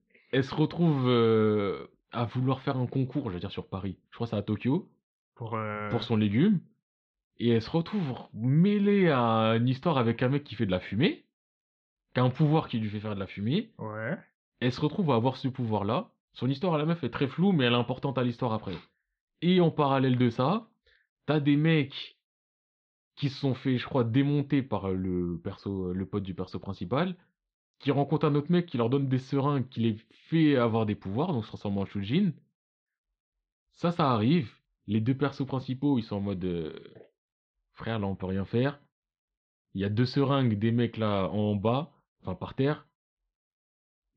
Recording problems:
muffled; slightly; fading above 4 kHz

